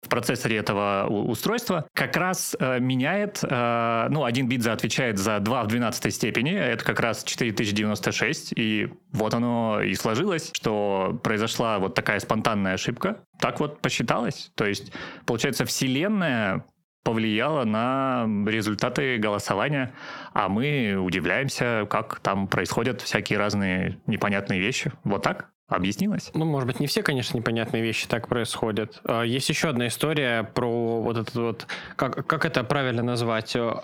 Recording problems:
squashed, flat; heavily

